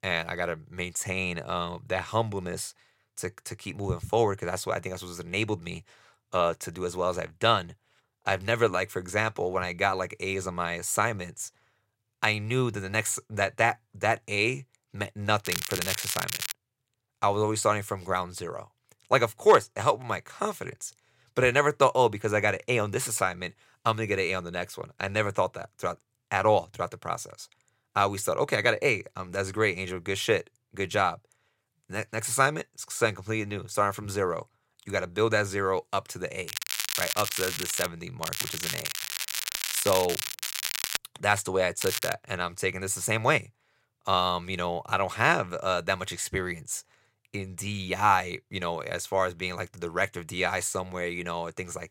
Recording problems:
crackling; loud; 4 times, first at 15 s; 3 dB below the speech

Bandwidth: 16 kHz